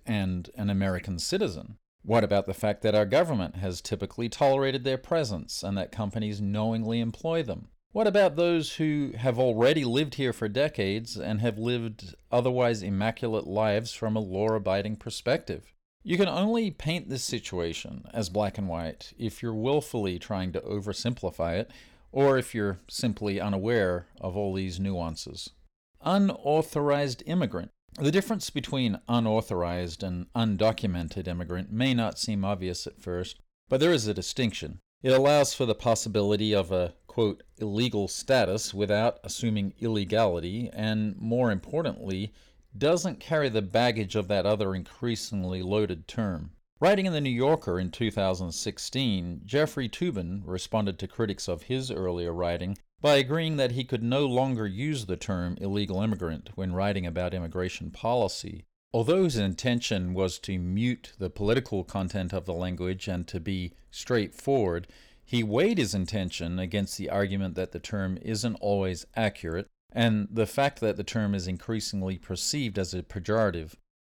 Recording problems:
uneven, jittery; strongly; from 26 to 59 s

